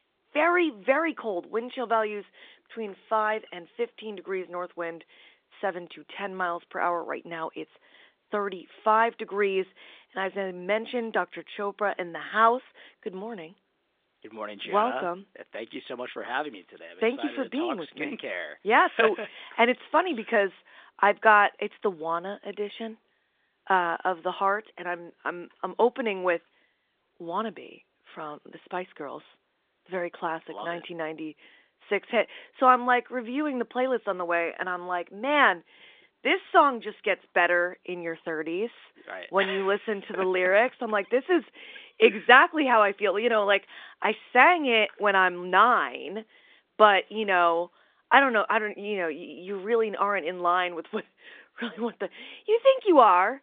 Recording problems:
phone-call audio

